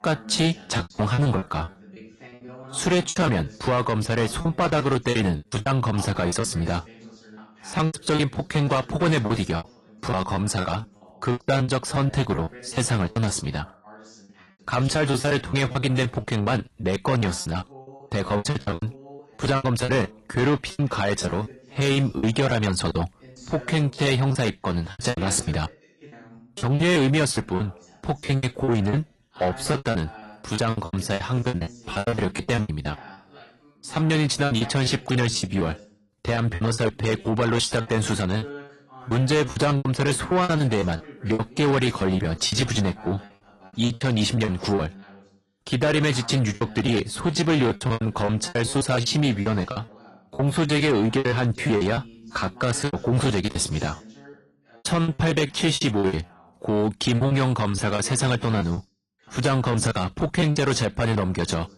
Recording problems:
distortion; slight; 10 dB below the speech
garbled, watery; slightly
voice in the background; faint; throughout; 20 dB below the speech
choppy; very; 17% of the speech affected

